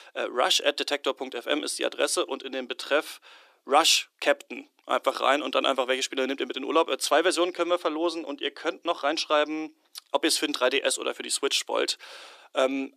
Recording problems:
thin; somewhat; fading below 350 Hz

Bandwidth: 14.5 kHz